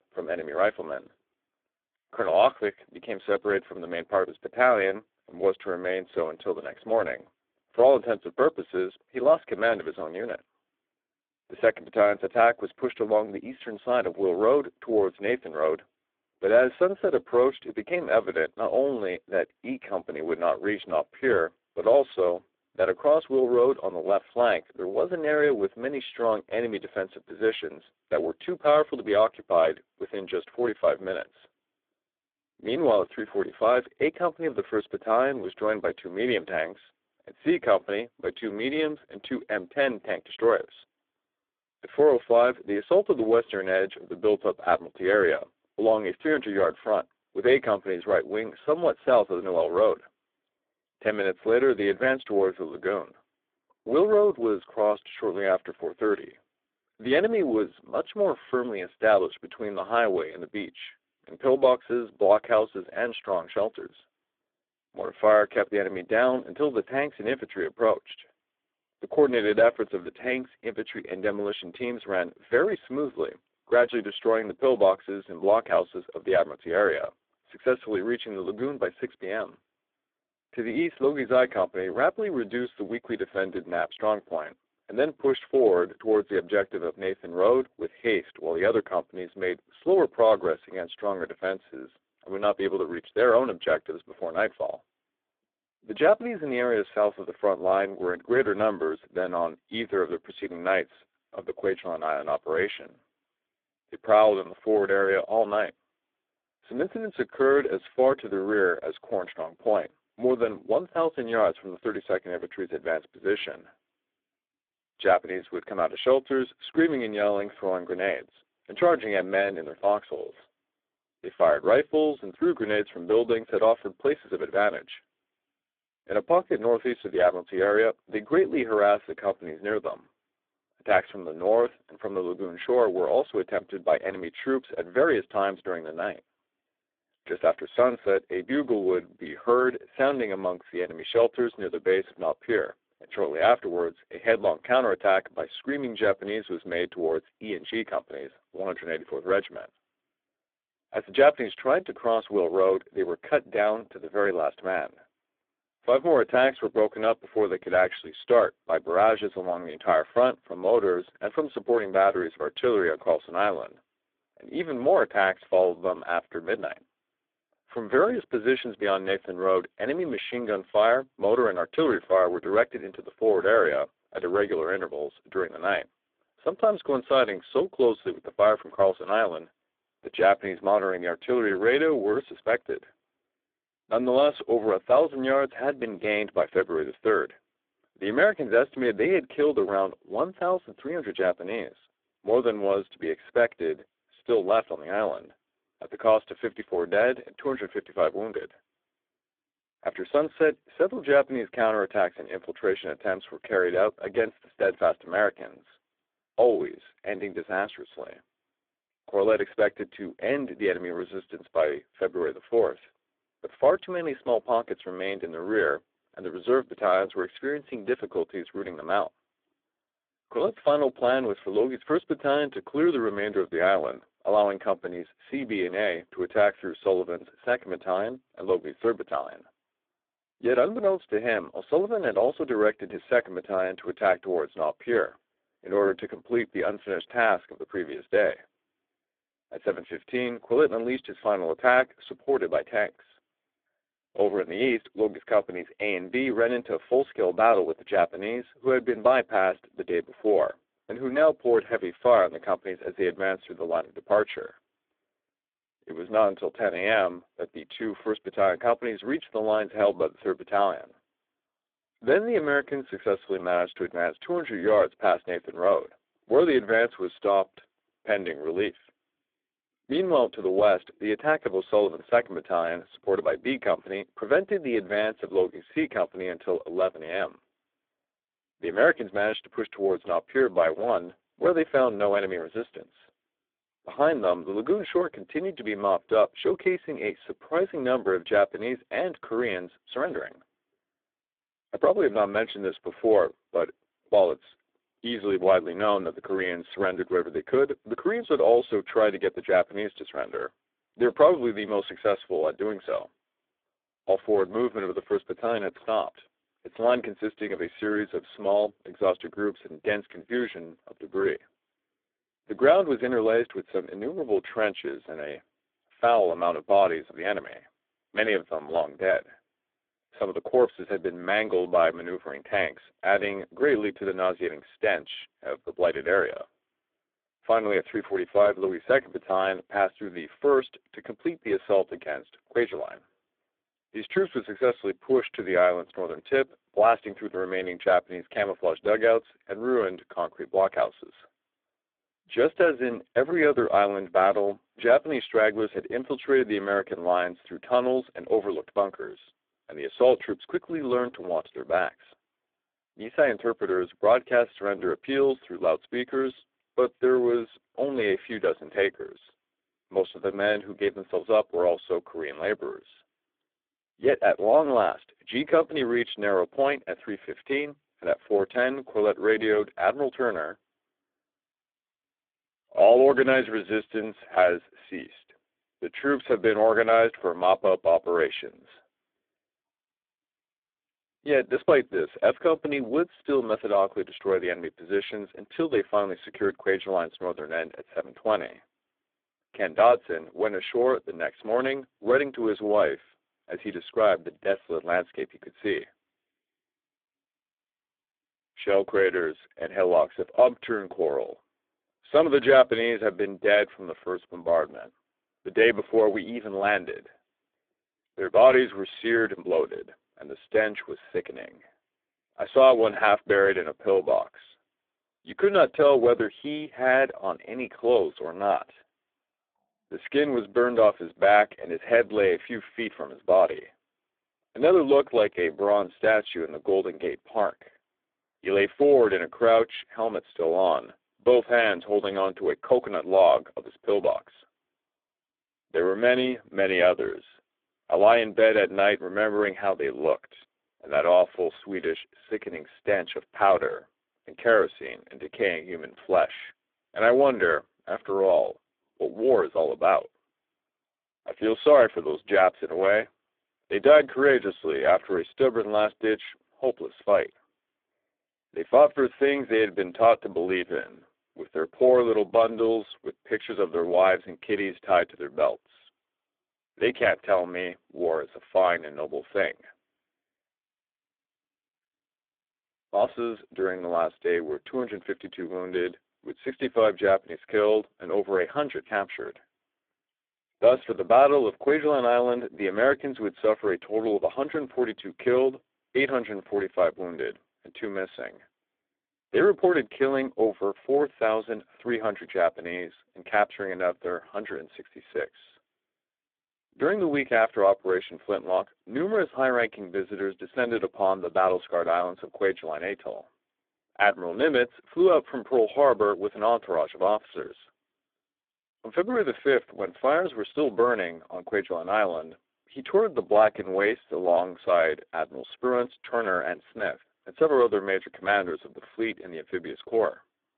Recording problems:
phone-call audio; poor line

